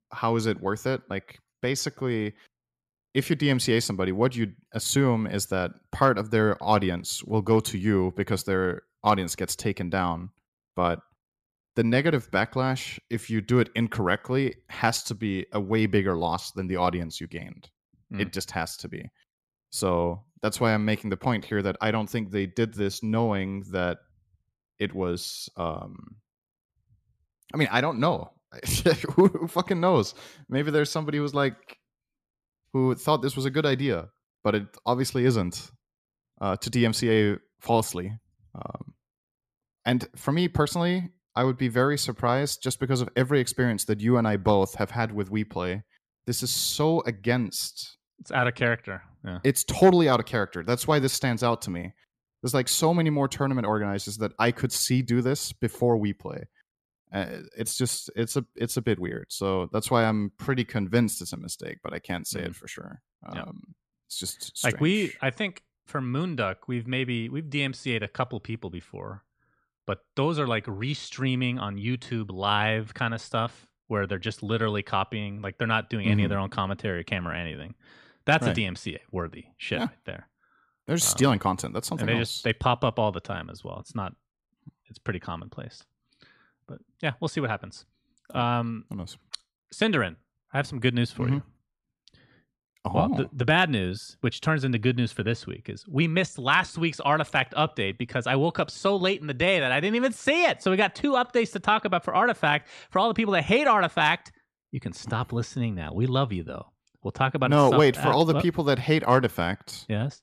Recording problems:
none

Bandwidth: 14.5 kHz